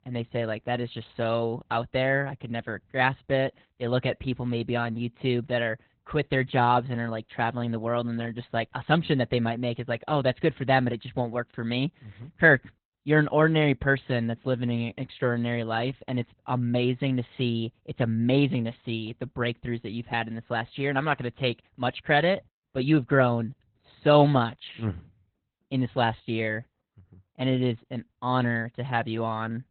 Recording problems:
garbled, watery; badly; nothing above 4 kHz

